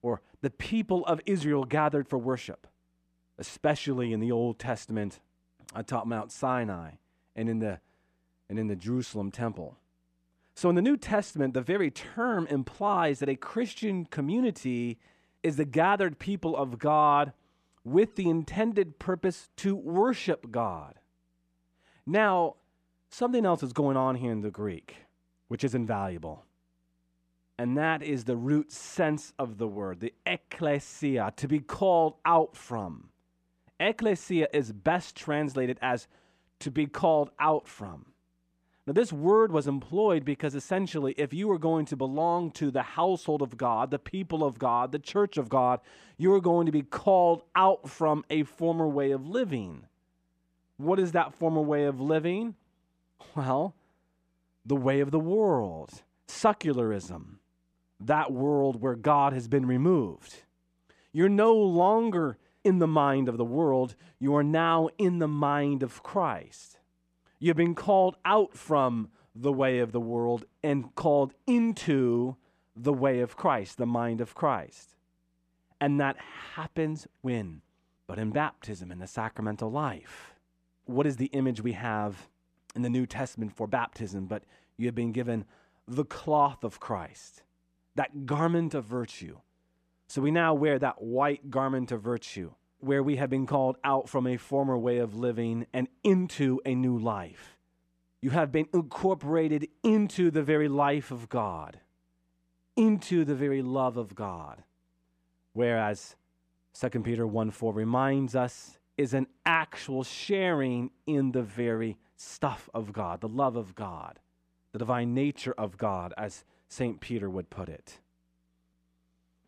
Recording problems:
none

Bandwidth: 14.5 kHz